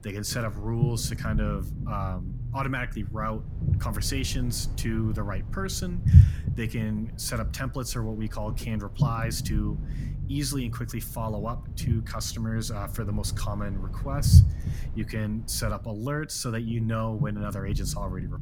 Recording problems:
low rumble; loud; throughout; 8 dB below the speech

